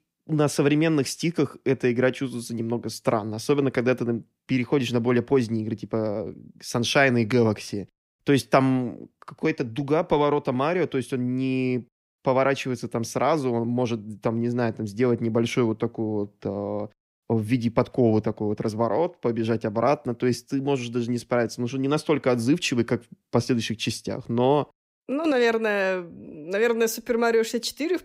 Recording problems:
none

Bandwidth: 15.5 kHz